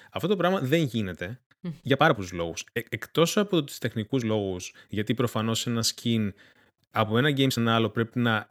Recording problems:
uneven, jittery; strongly; from 1 to 7.5 s

